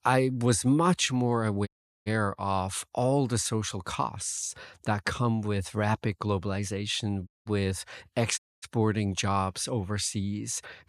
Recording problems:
audio cutting out; at 1.5 s, at 7.5 s and at 8.5 s

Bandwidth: 14.5 kHz